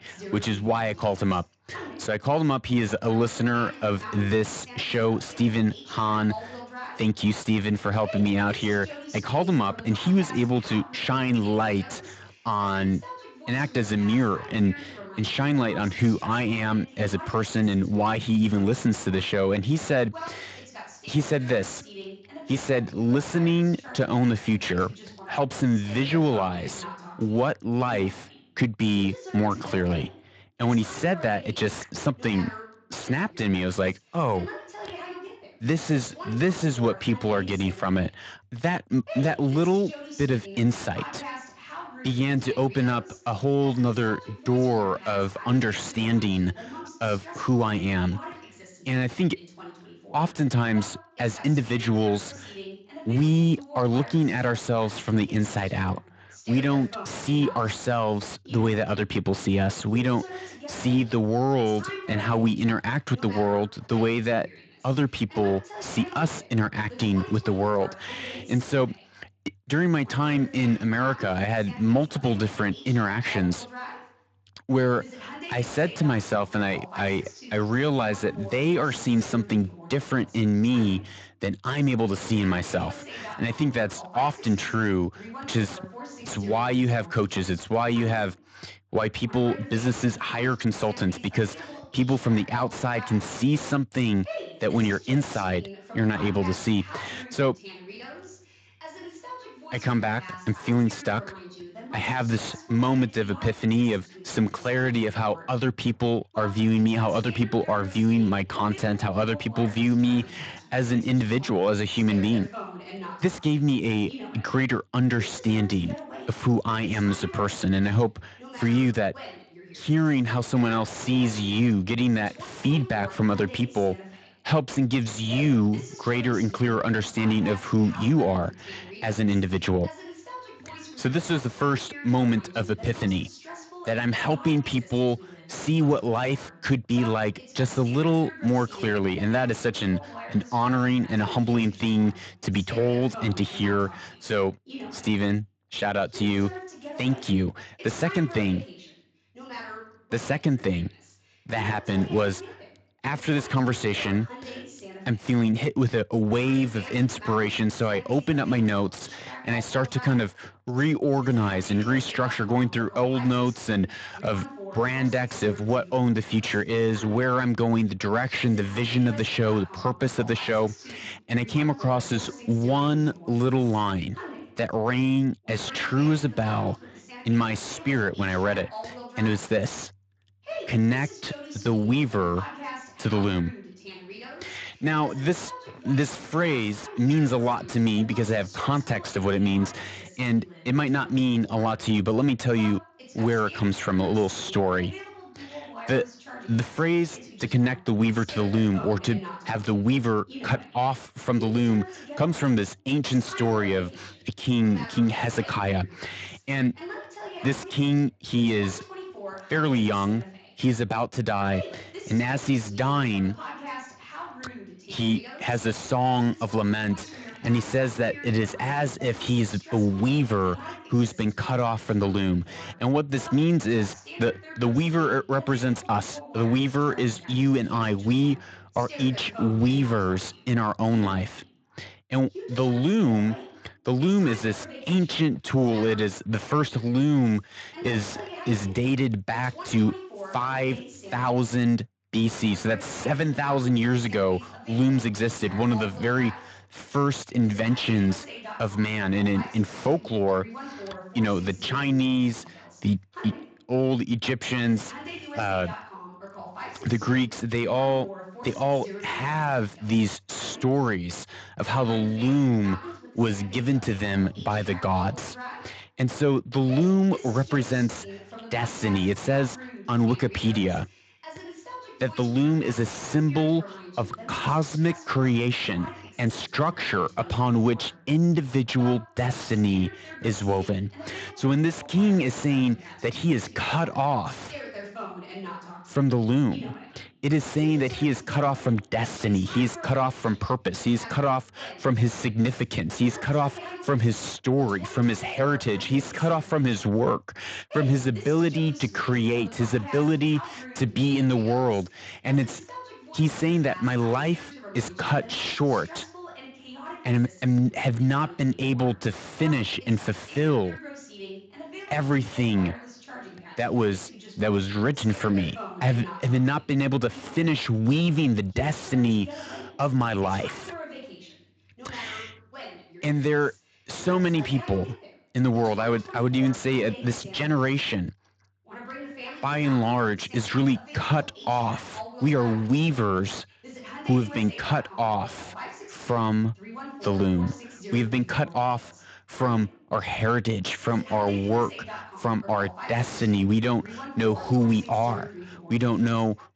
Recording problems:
distortion; slight; 9 dB below the speech
garbled, watery; slightly; nothing above 7.5 kHz
voice in the background; noticeable; throughout; 15 dB below the speech

